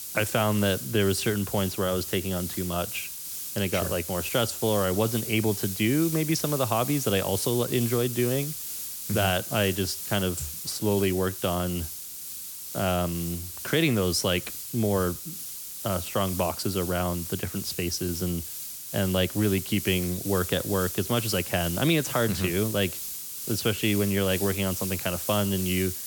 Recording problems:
hiss; loud; throughout; 6 dB below the speech

